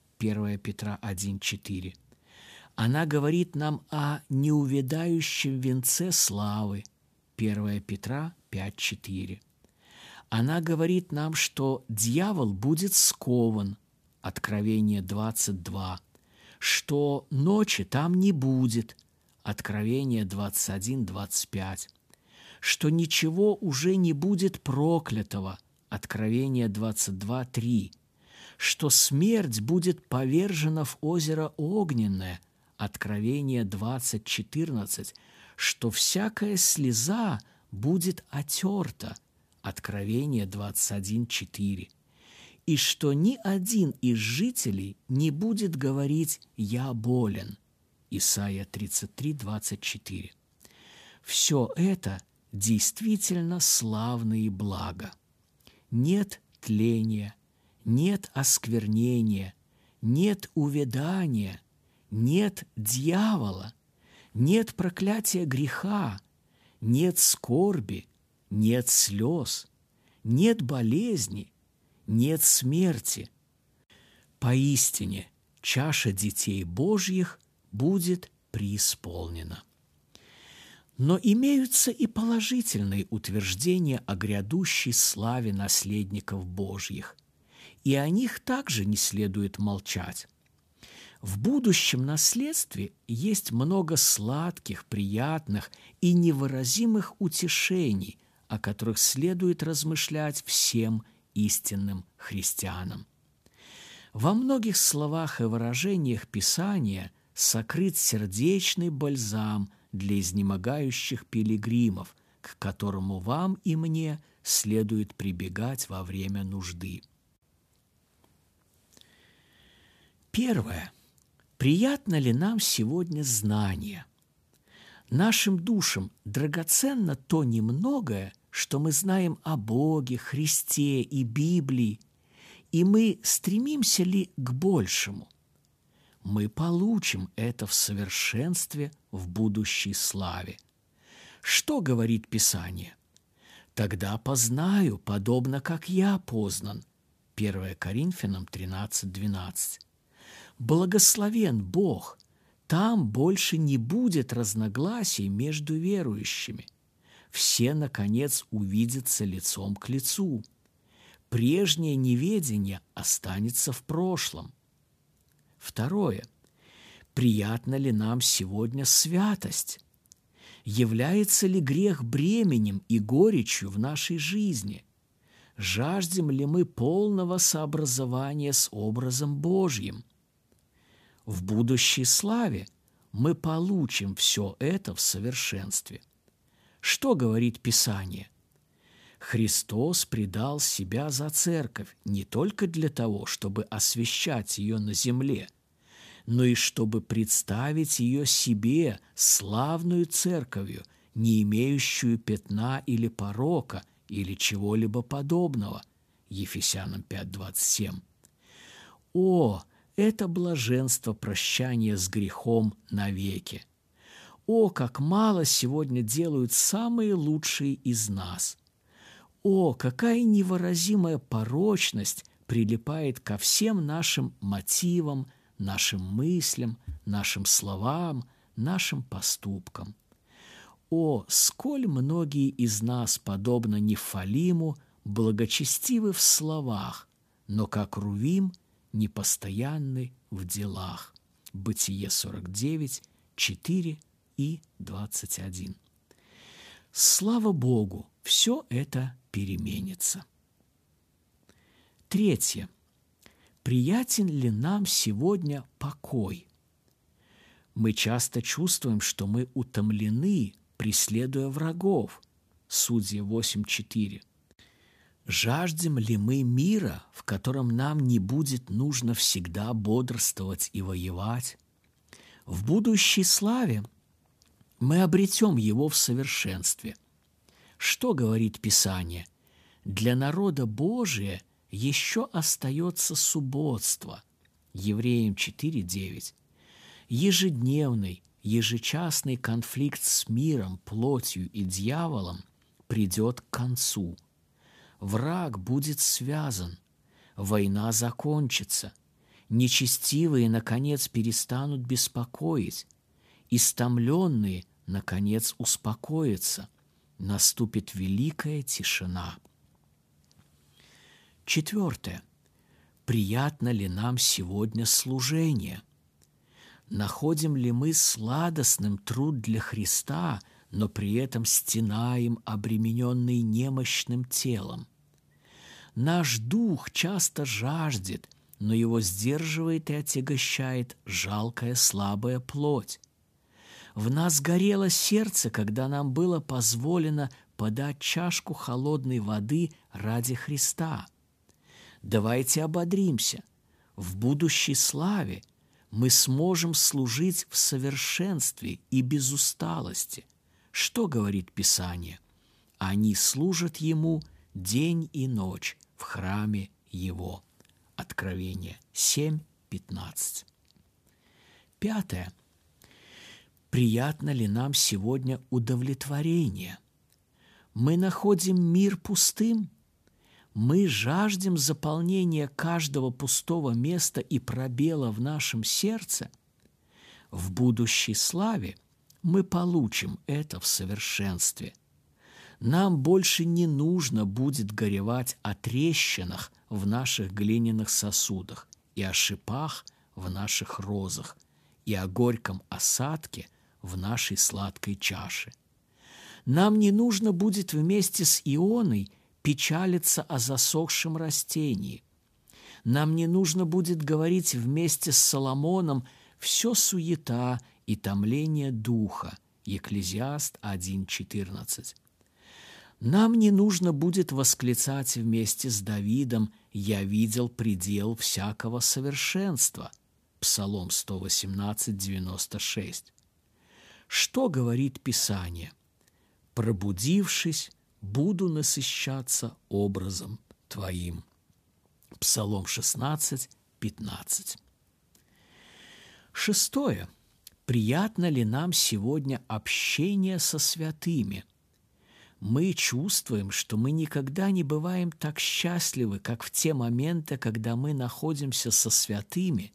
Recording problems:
none

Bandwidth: 14.5 kHz